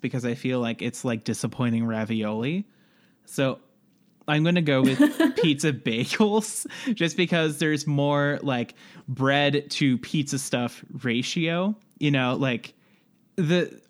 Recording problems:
none

